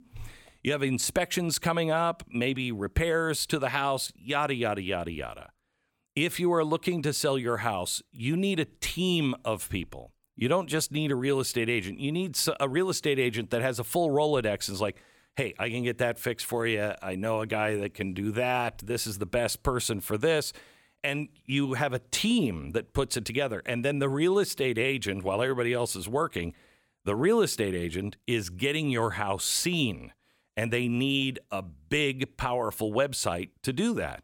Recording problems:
none

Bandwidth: 17.5 kHz